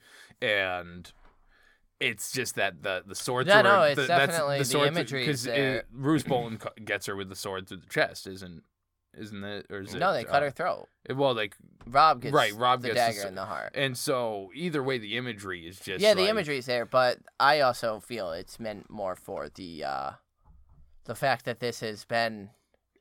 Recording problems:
none

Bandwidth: 17 kHz